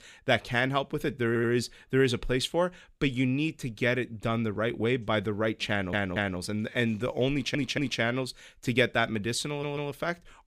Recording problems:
audio stuttering; 4 times, first at 1.5 s

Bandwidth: 15 kHz